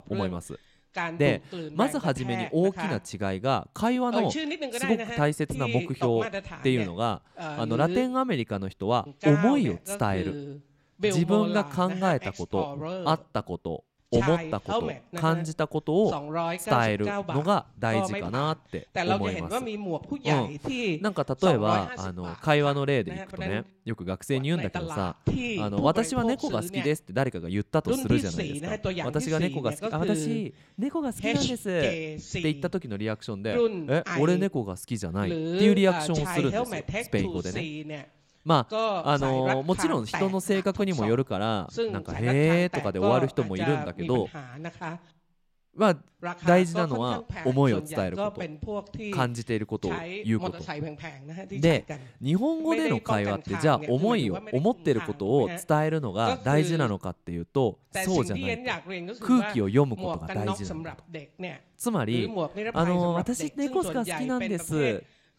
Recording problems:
voice in the background; loud; throughout; 6 dB below the speech

